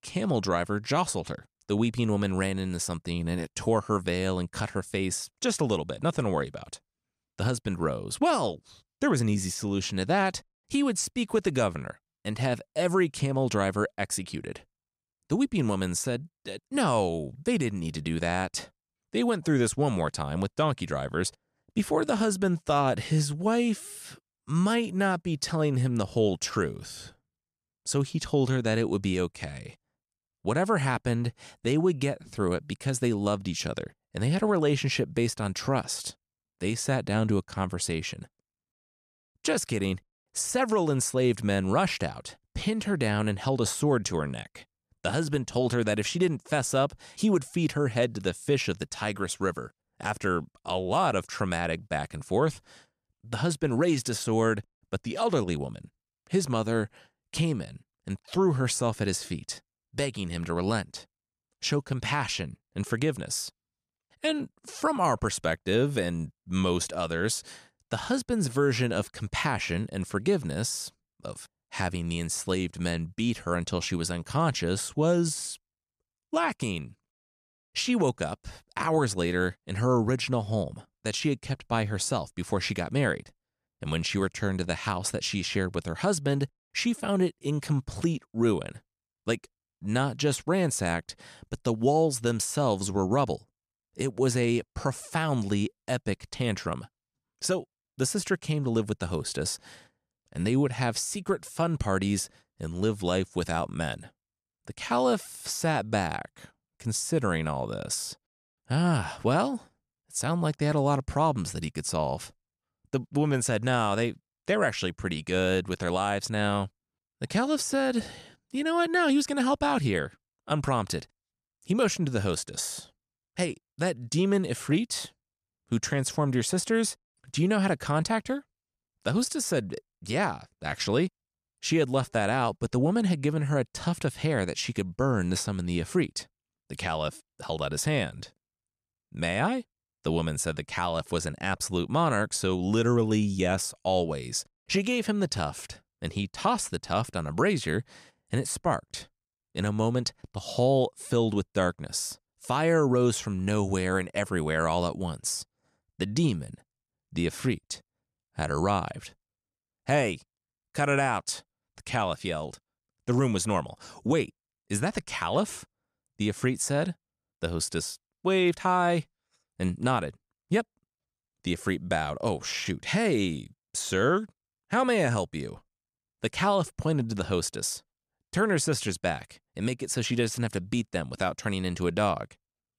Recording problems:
none

